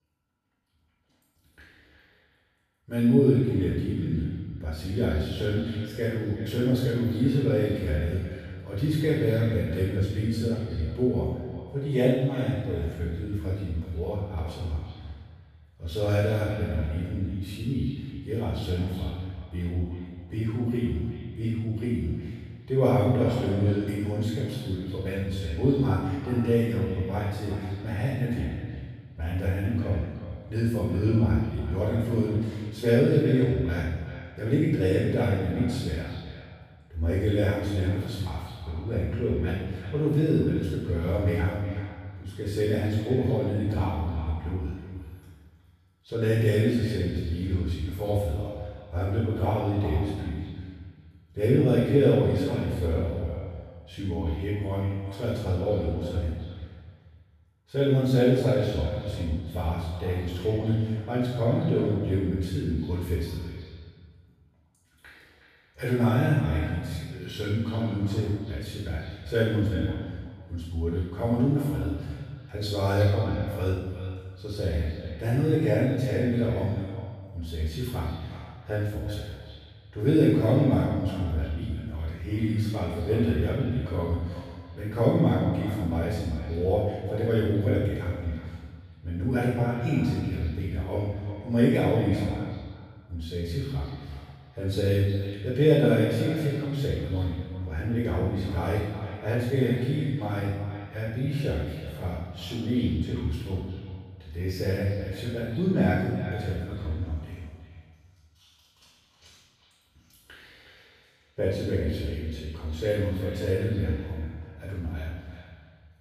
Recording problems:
room echo; strong; dies away in 1.1 s
off-mic speech; far
echo of what is said; noticeable; throughout; 370 ms later, 15 dB below the speech

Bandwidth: 14.5 kHz